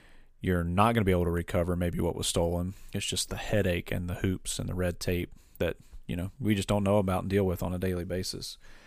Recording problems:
none

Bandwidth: 15 kHz